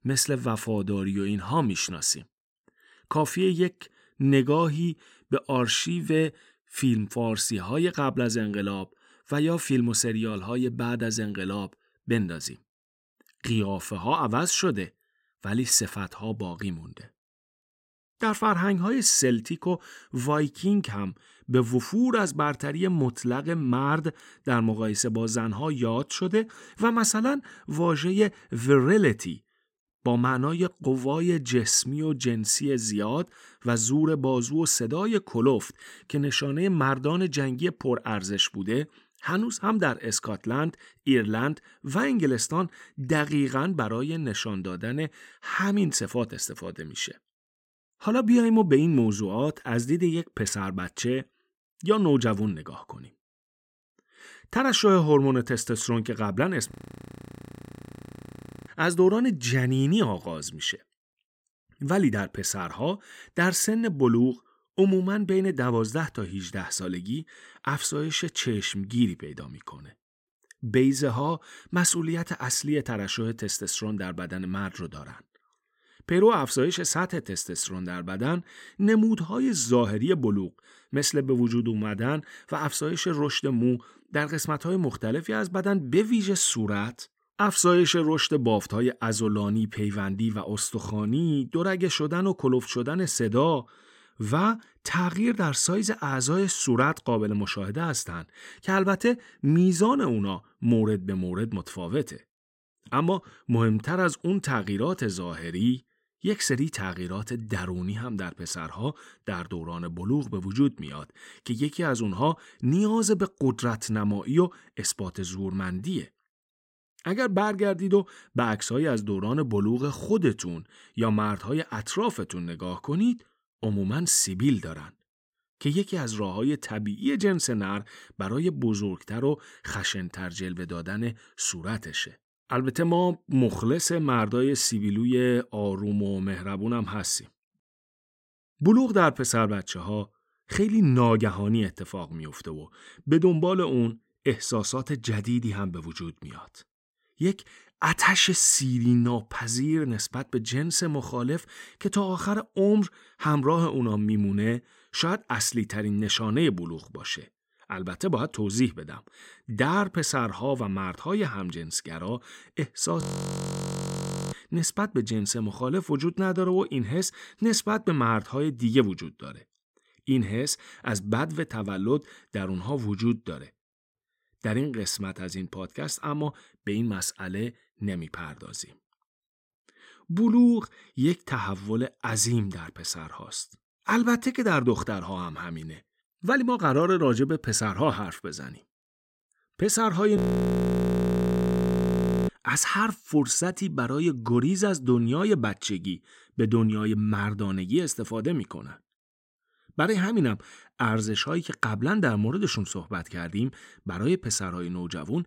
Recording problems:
audio freezing; at 57 s for 2 s, at 2:43 for 1.5 s and at 3:10 for 2 s

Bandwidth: 16 kHz